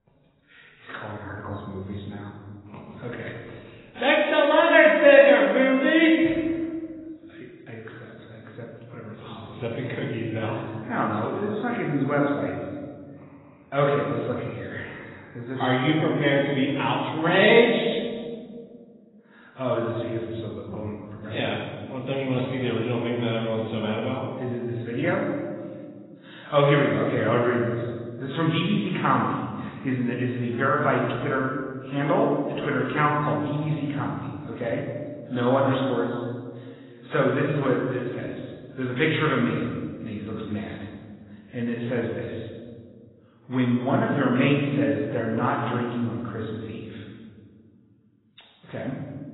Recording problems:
garbled, watery; badly; nothing above 4 kHz
room echo; noticeable; dies away in 1.5 s
off-mic speech; somewhat distant

